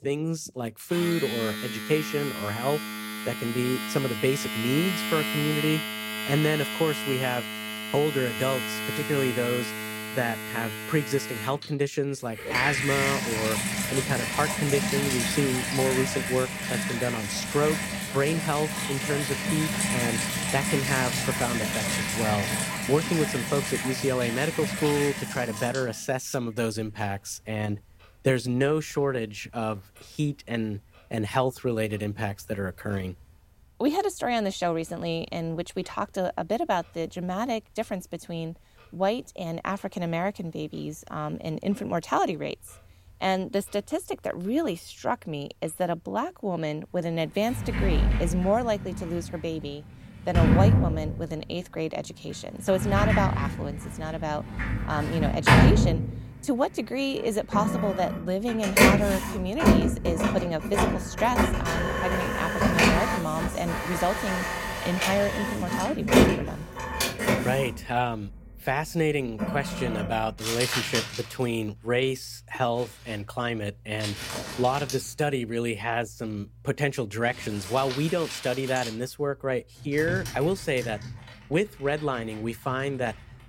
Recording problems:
household noises; very loud; throughout; 1 dB above the speech

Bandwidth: 16 kHz